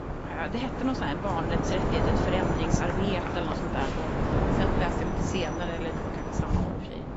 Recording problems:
garbled, watery; badly; nothing above 7.5 kHz
wind noise on the microphone; heavy; as loud as the speech
traffic noise; loud; throughout; 2 dB below the speech

